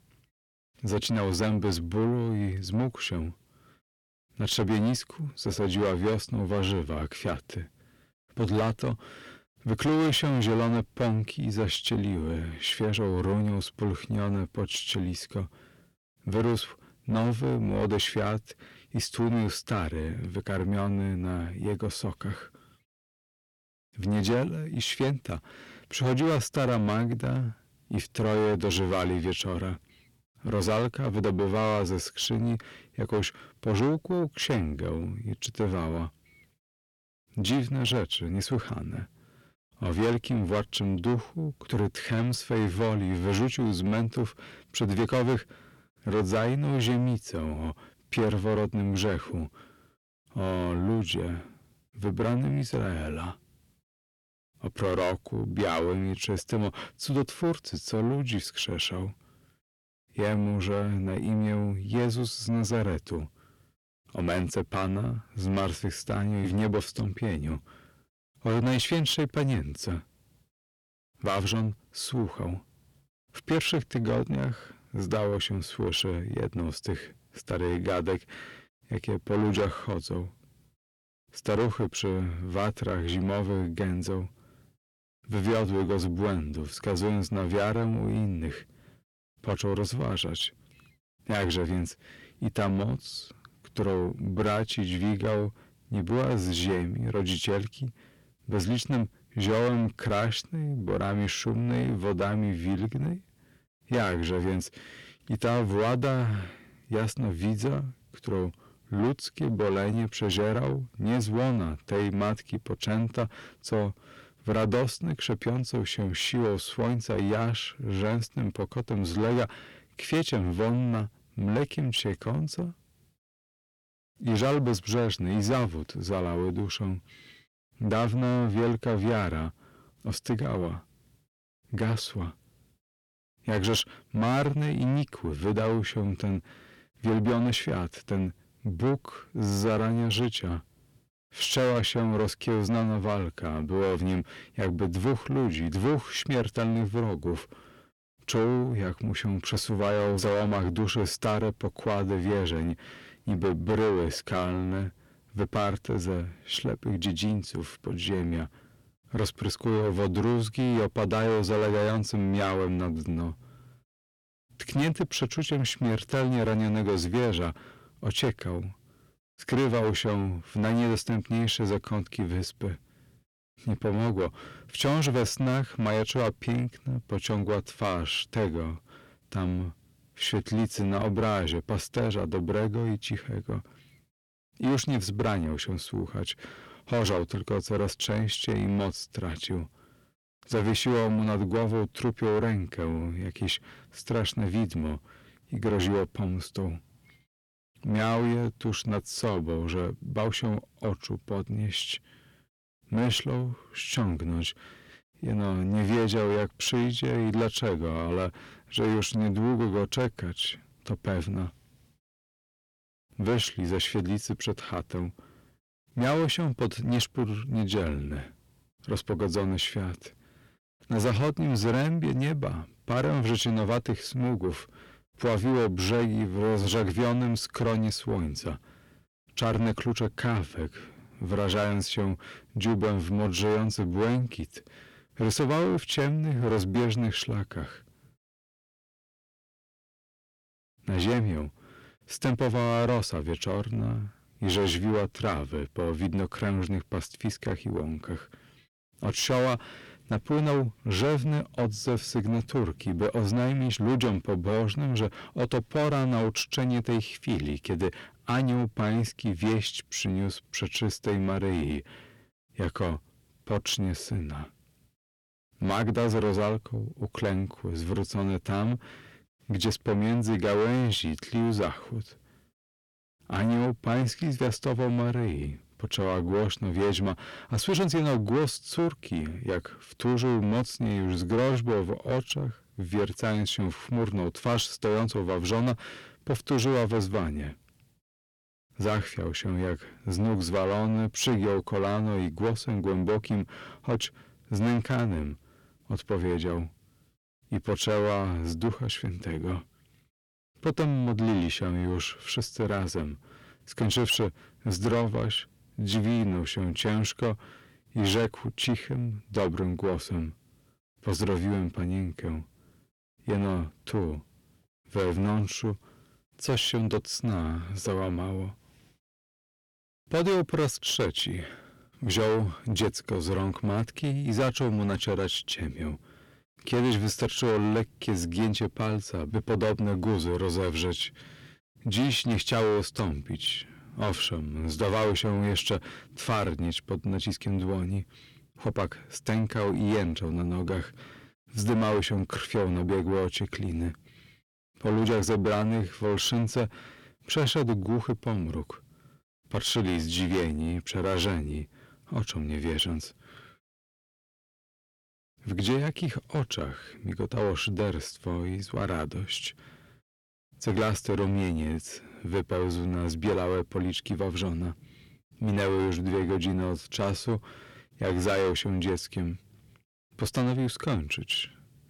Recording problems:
distortion; heavy; 6 dB below the speech

